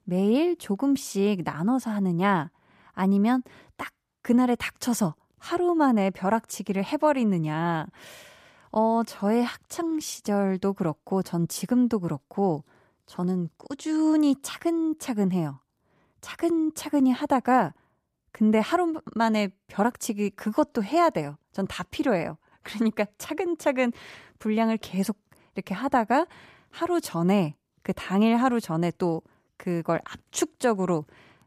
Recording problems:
none

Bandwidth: 14.5 kHz